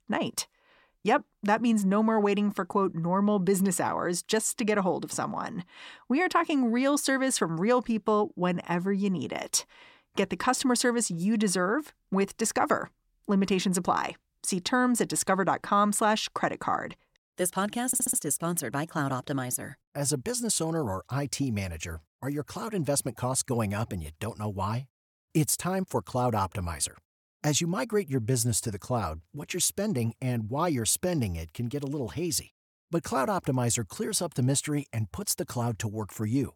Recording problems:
audio stuttering; at 18 s

